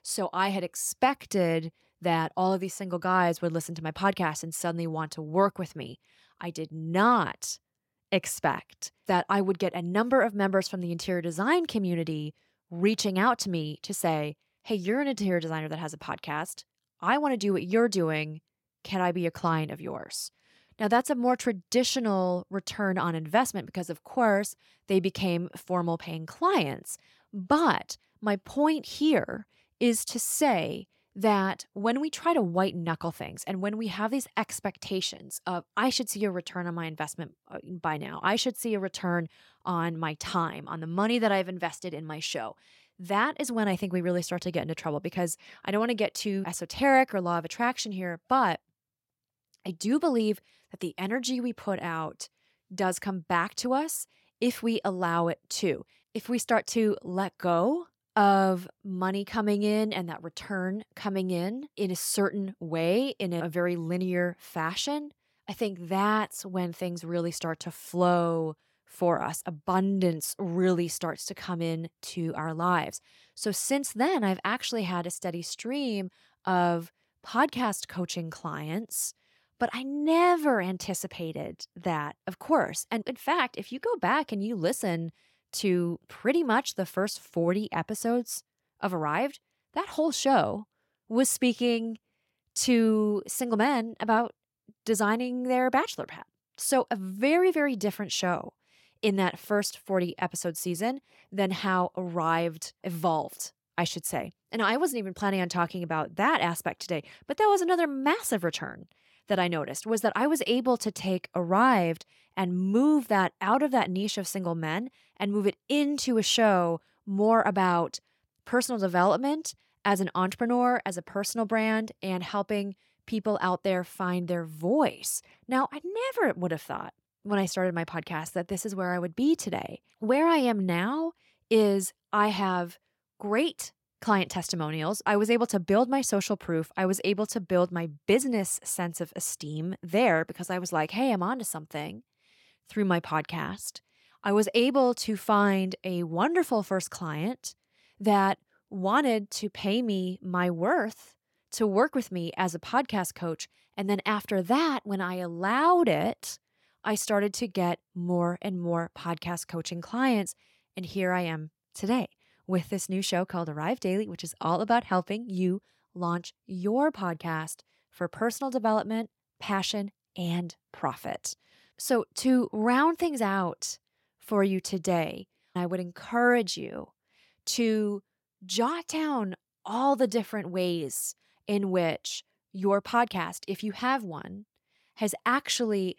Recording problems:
none

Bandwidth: 17 kHz